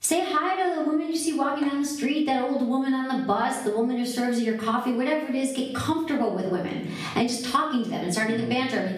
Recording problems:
off-mic speech; far
room echo; noticeable; dies away in 0.6 s
squashed, flat; somewhat

